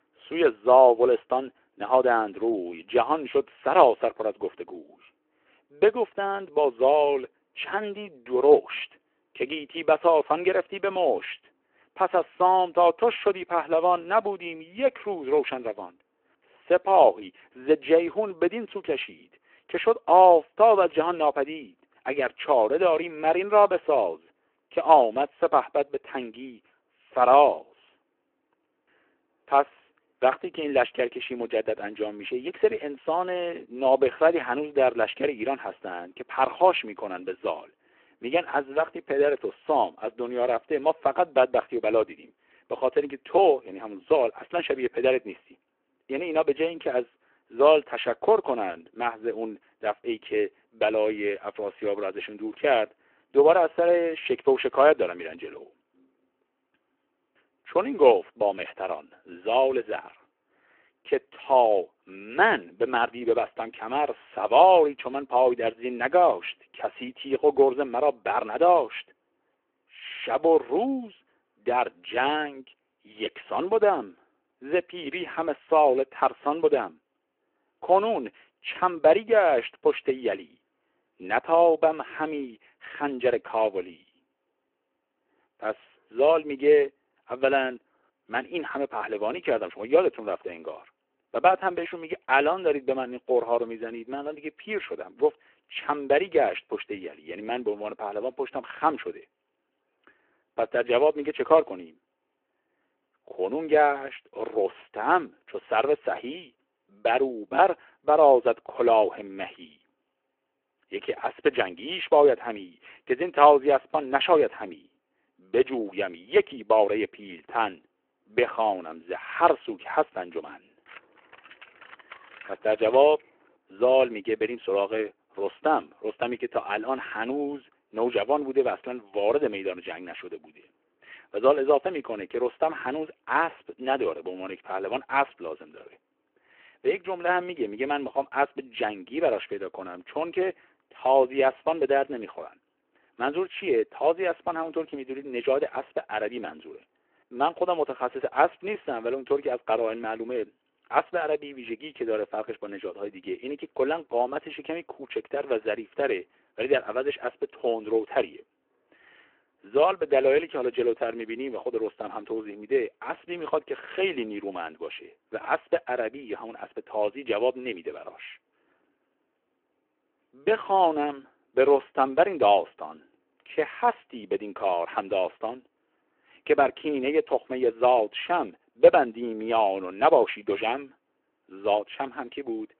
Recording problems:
phone-call audio
jangling keys; faint; from 2:01 to 2:03; peak 20 dB below the speech

